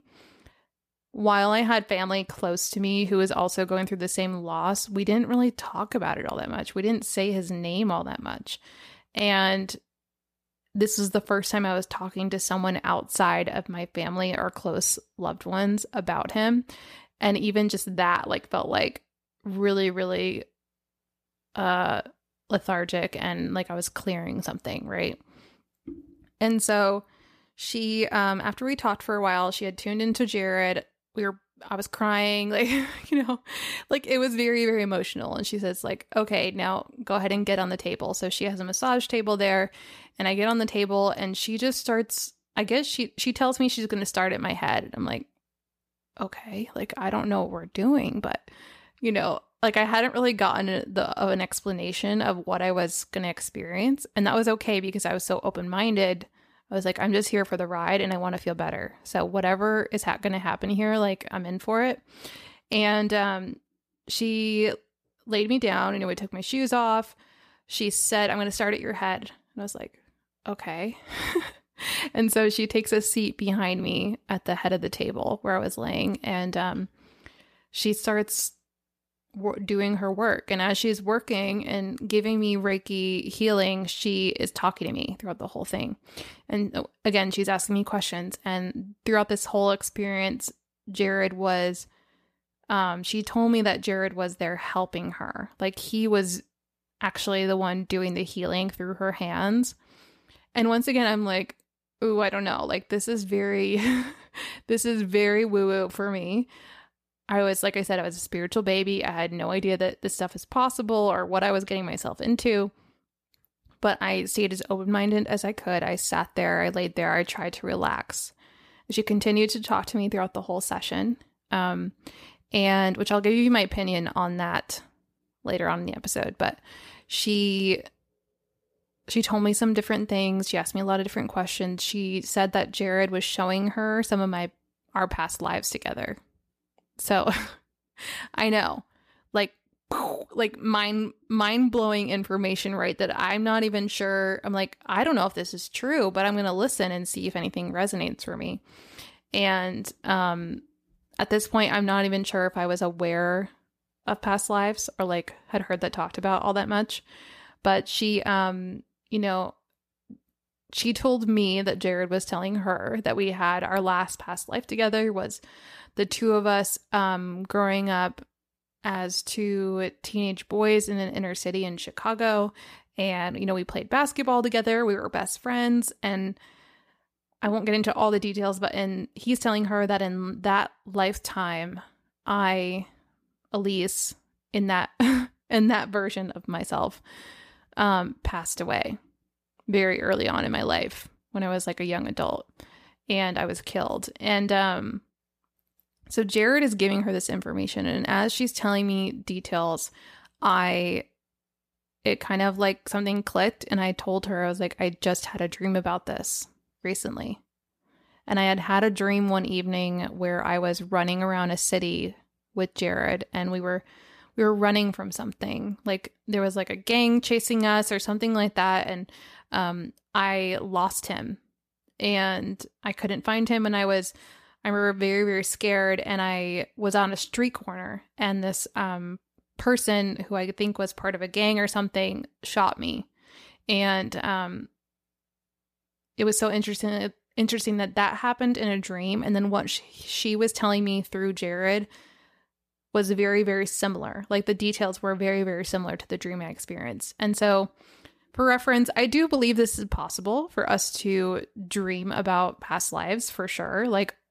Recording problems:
none

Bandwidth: 14.5 kHz